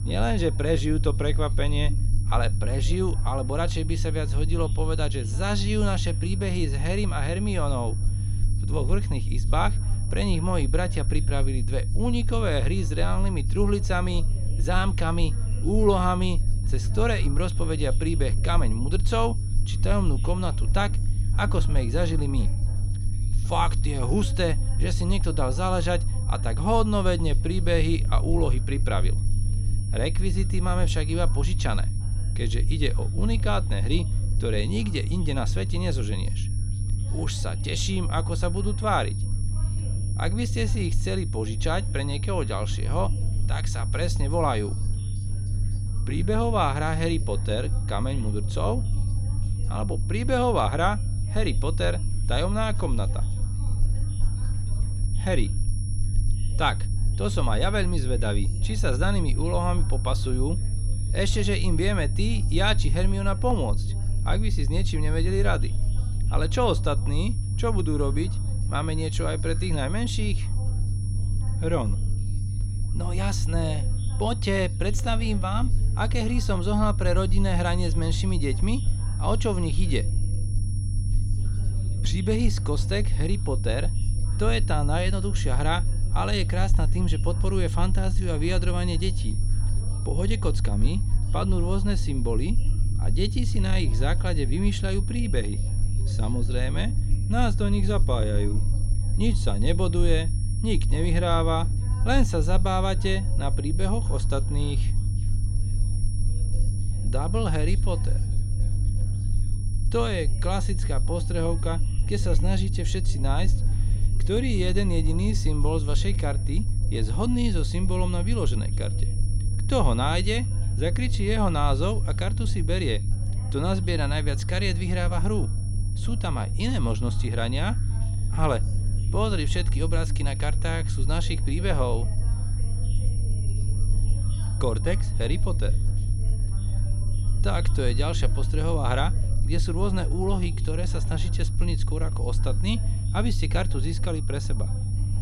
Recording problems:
high-pitched whine; noticeable; throughout; 10 kHz, 15 dB below the speech
low rumble; noticeable; throughout; 15 dB below the speech
background chatter; faint; throughout; 2 voices, 25 dB below the speech

